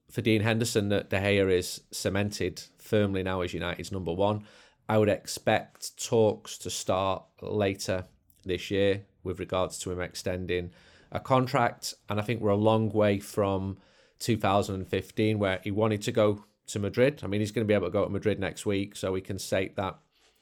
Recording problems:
none

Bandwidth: 18.5 kHz